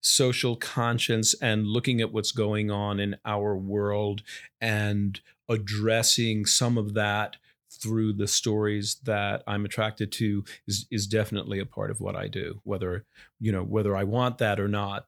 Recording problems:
none

